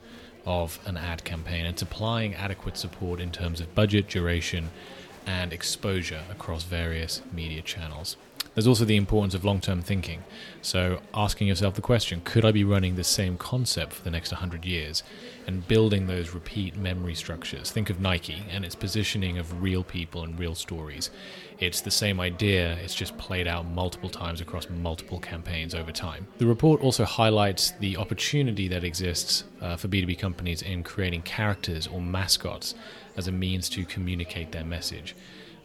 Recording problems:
murmuring crowd; faint; throughout; 20 dB below the speech

